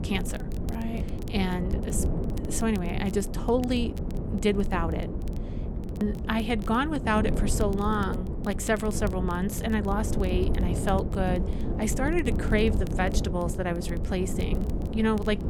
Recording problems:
wind noise on the microphone; heavy; 9 dB below the speech
crackle, like an old record; faint; 25 dB below the speech

